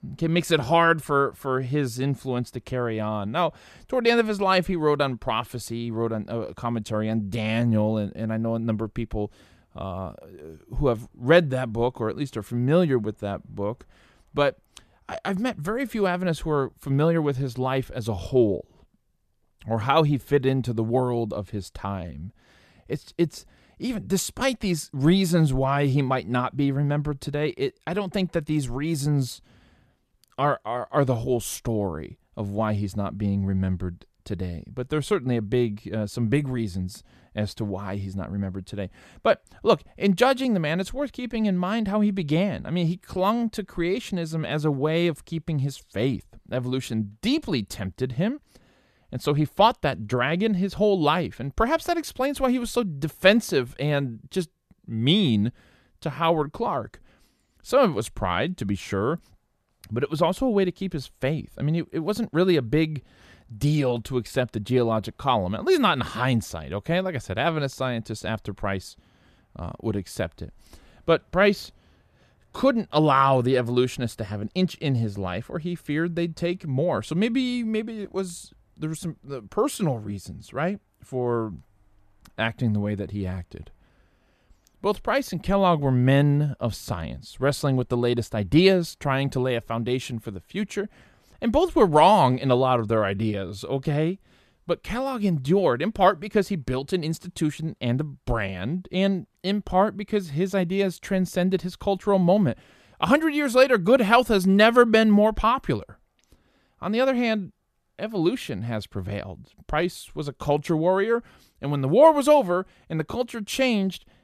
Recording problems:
none

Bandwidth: 14.5 kHz